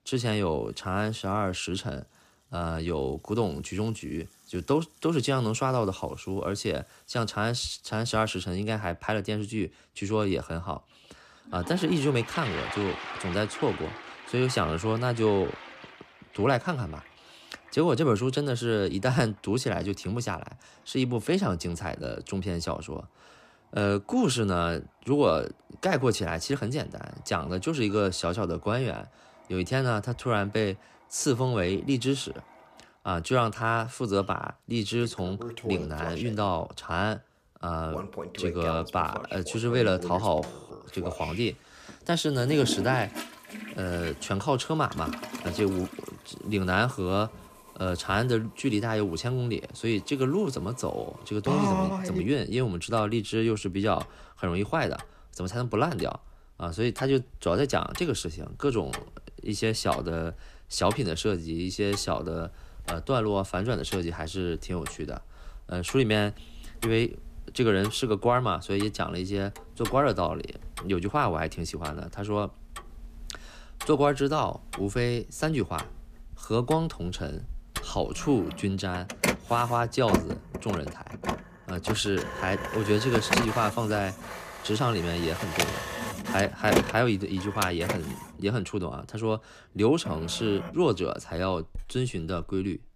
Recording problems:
household noises; loud; throughout; 7 dB below the speech

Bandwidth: 14.5 kHz